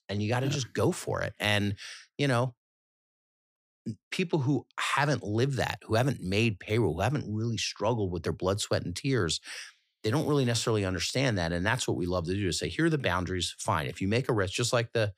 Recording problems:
none

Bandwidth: 15 kHz